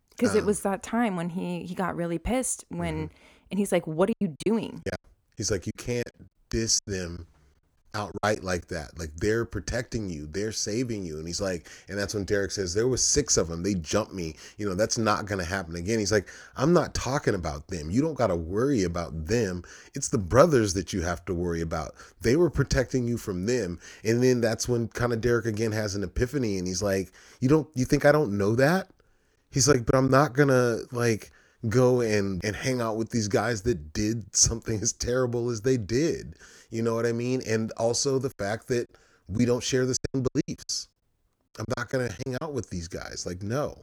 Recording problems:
choppy; very; from 4 to 8.5 s, at 30 s and from 38 to 42 s; 15% of the speech affected

